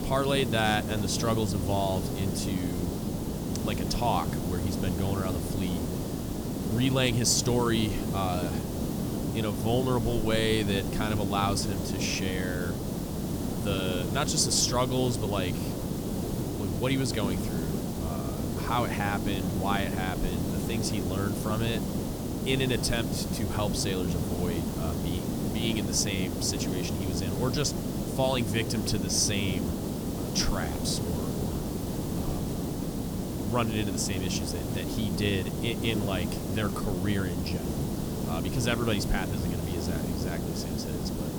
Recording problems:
hiss; loud; throughout; 2 dB below the speech

